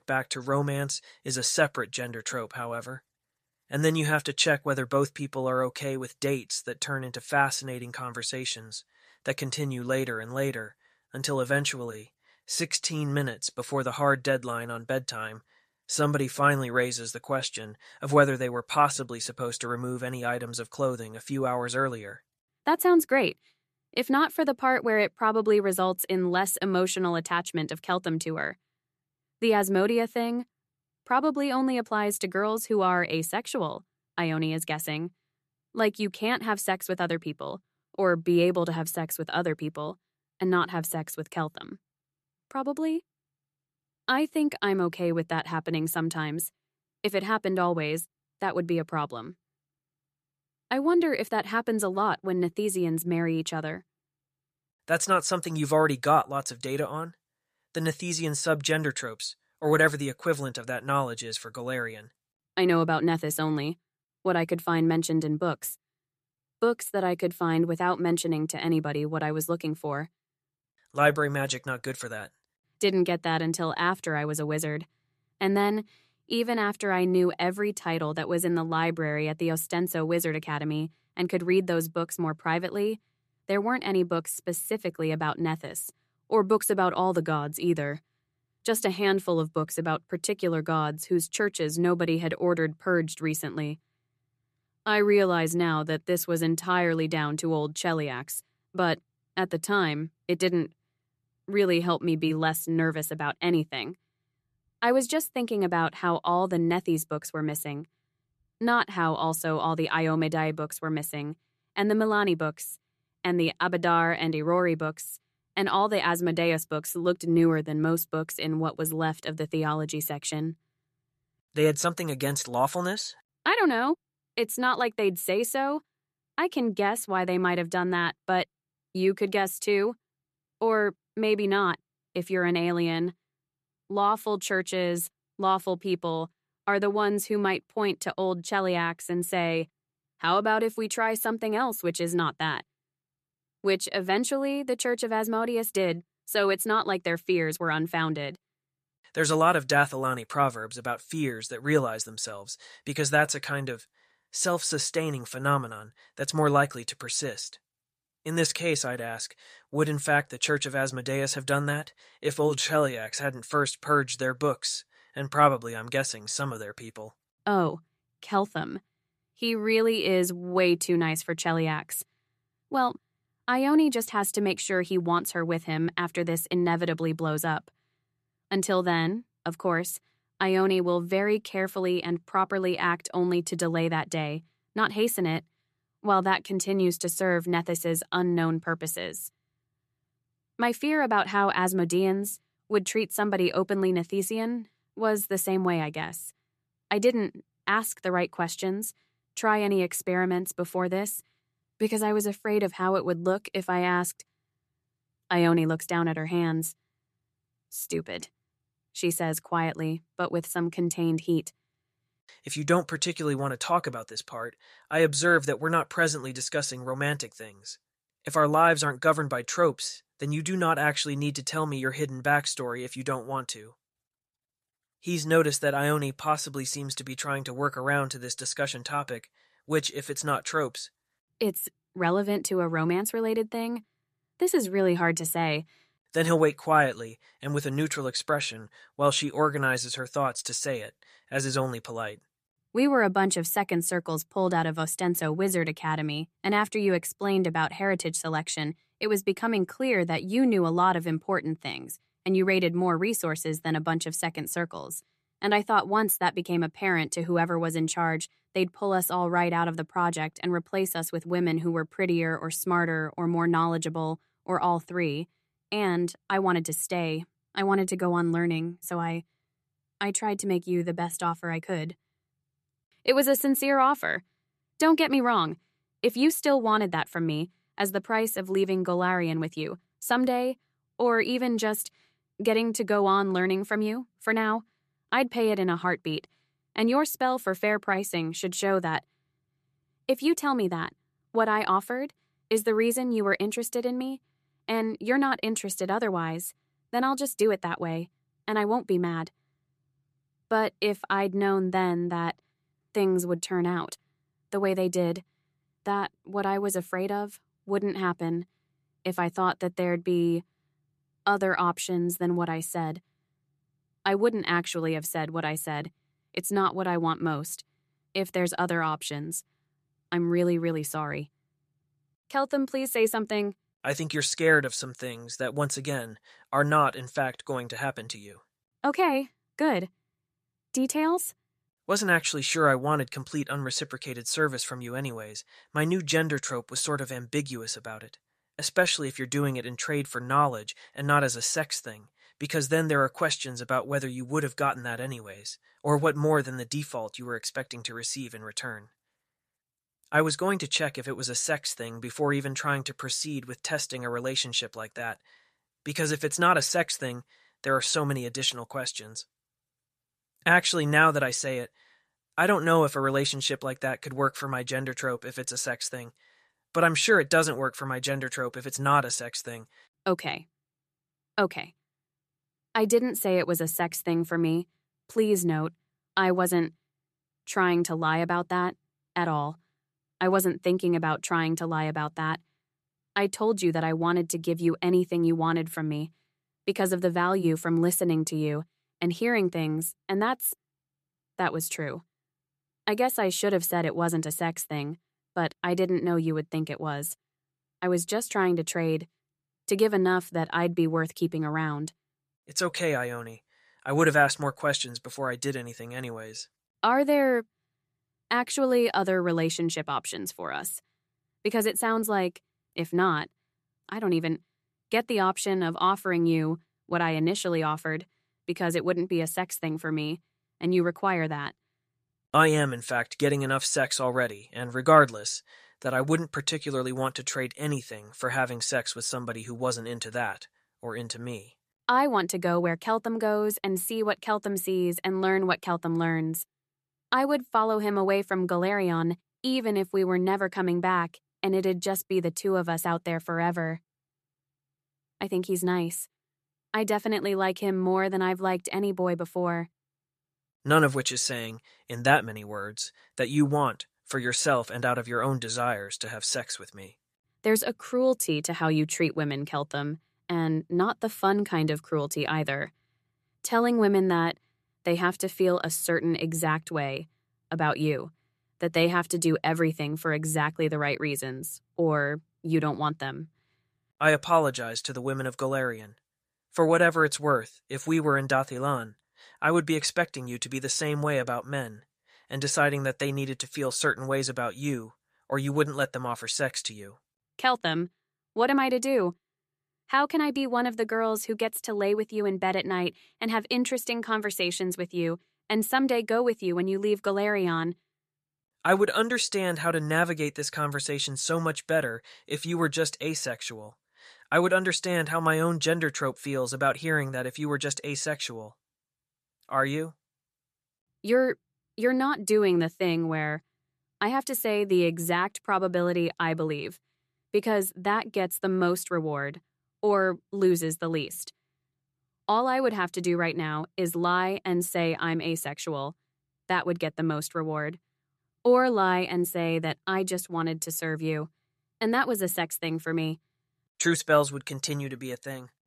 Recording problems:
none

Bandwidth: 14 kHz